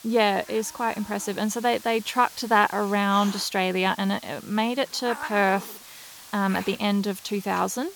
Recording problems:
hiss; noticeable; throughout; 15 dB below the speech

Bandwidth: 18.5 kHz